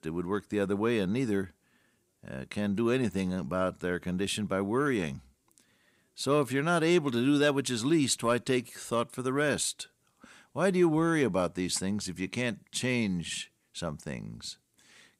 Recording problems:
none

